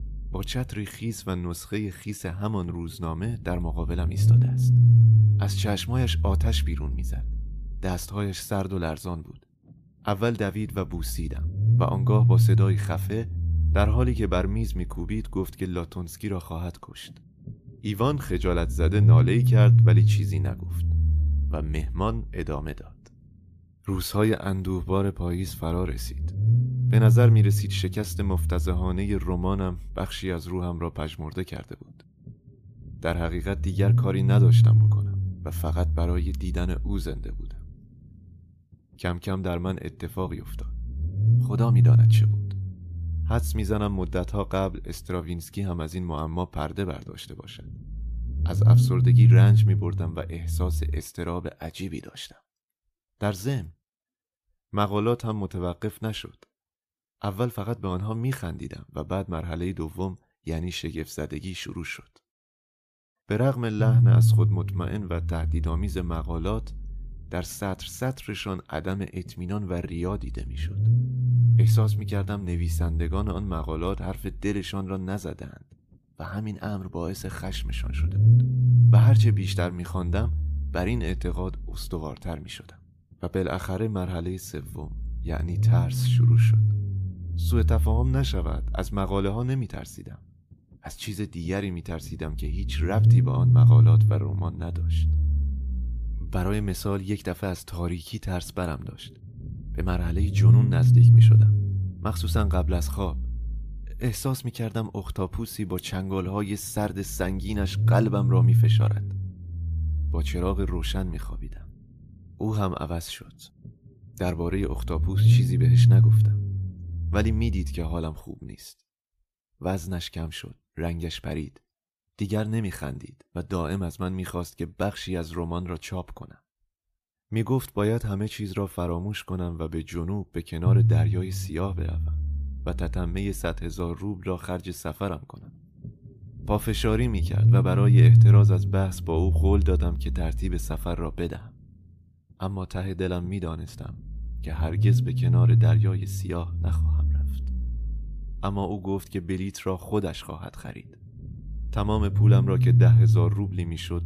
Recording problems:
low rumble; loud; until 51 s, from 1:04 to 1:58 and from 2:11 on; 1 dB below the speech

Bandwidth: 14.5 kHz